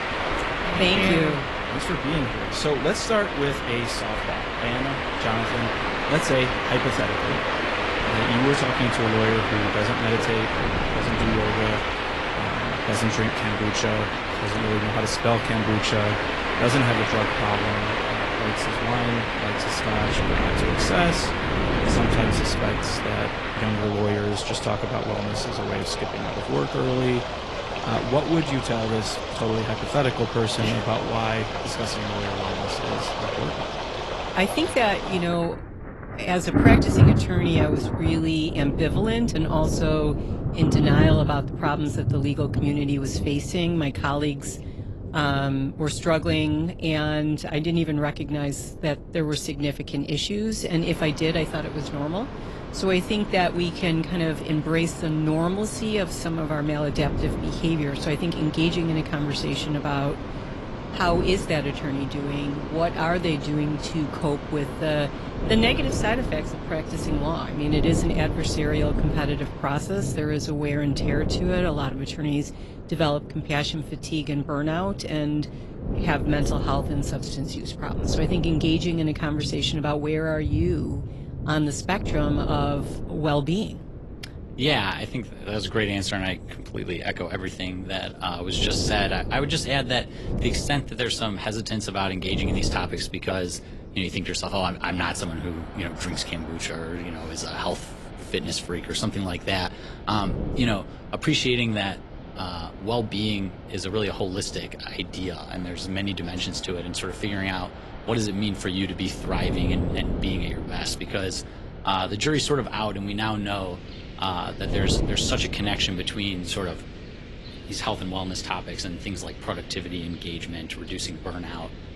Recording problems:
garbled, watery; slightly; nothing above 11.5 kHz
rain or running water; loud; throughout; 2 dB below the speech
wind noise on the microphone; occasional gusts; 15 dB below the speech

